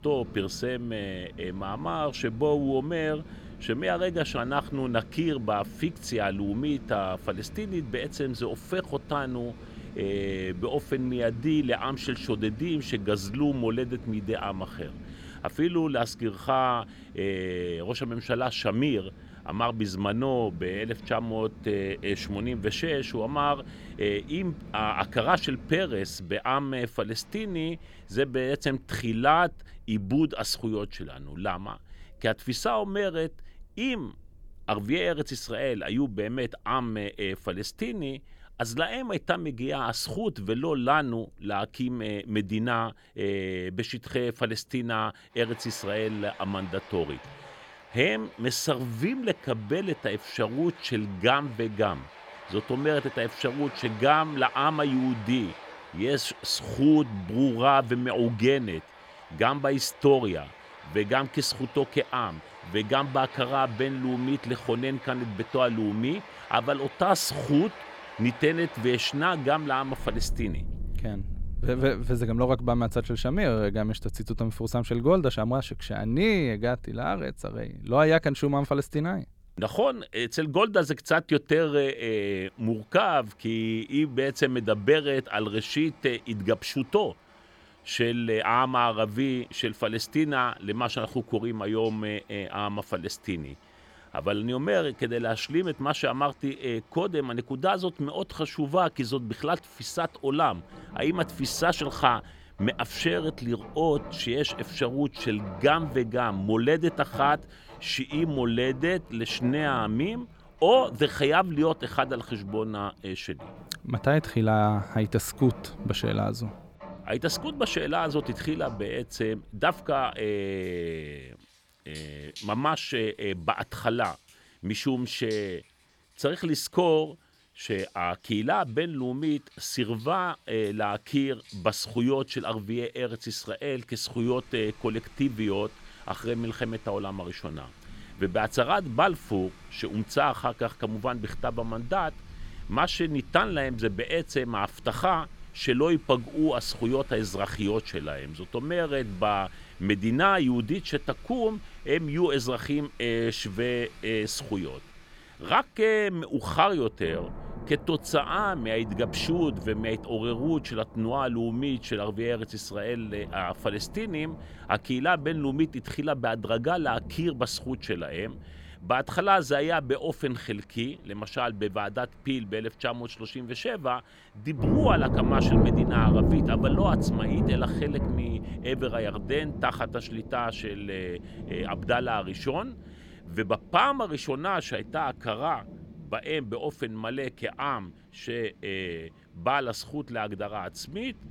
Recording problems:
rain or running water; loud; throughout; 10 dB below the speech

